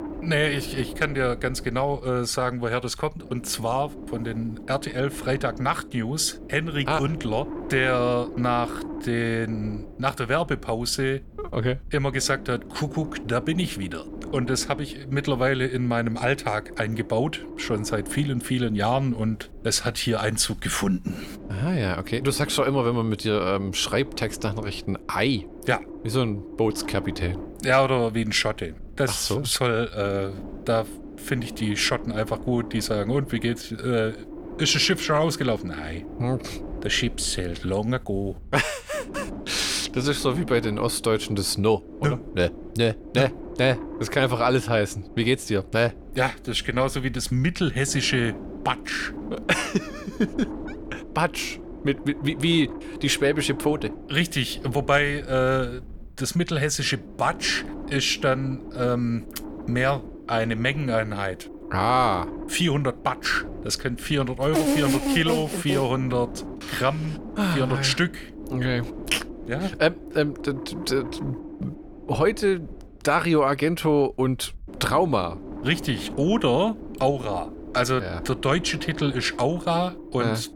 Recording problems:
wind noise on the microphone; occasional gusts; 15 dB below the speech

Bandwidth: 18.5 kHz